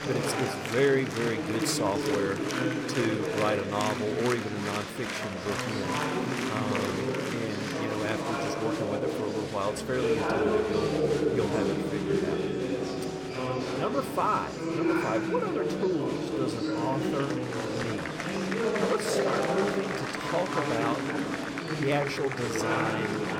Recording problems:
murmuring crowd; very loud; throughout; 2 dB above the speech

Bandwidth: 17 kHz